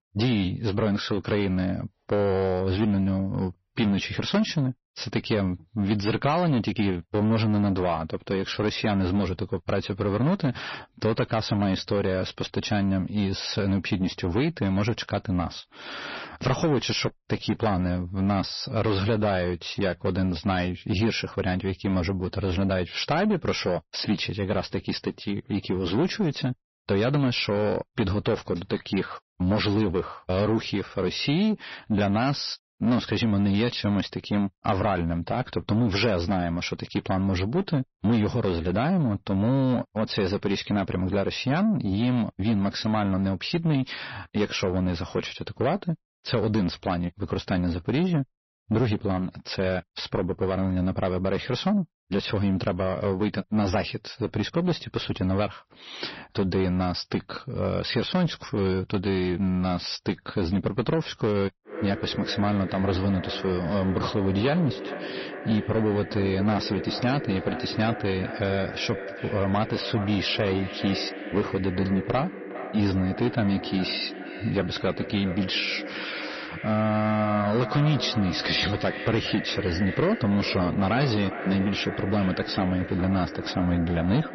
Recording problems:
echo of what is said; strong; from 1:02 on; 410 ms later, 9 dB below the speech
distortion; slight; 10 dB below the speech
garbled, watery; slightly; nothing above 6 kHz

